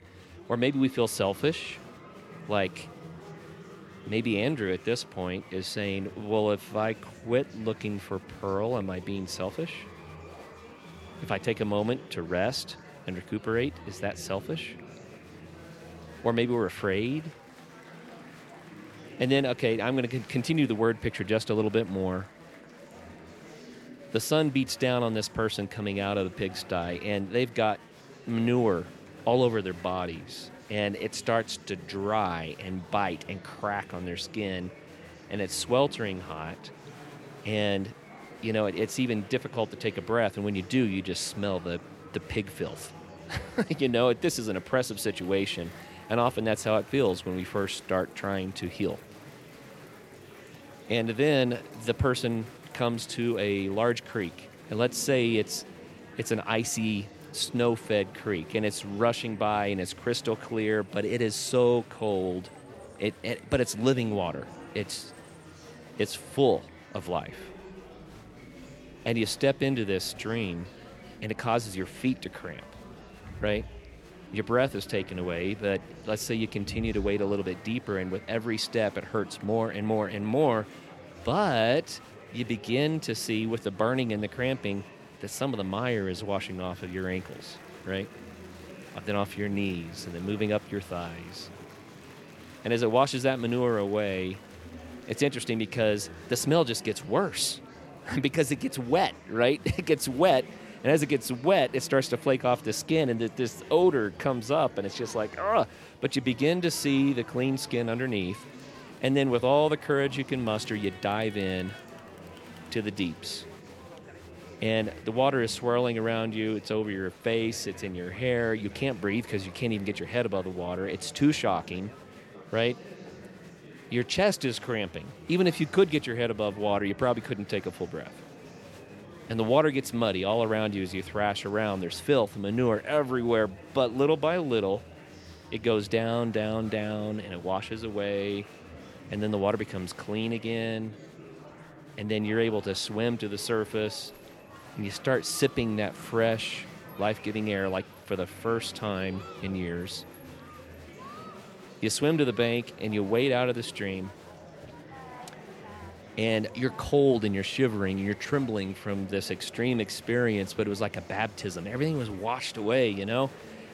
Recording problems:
murmuring crowd; noticeable; throughout; 20 dB below the speech

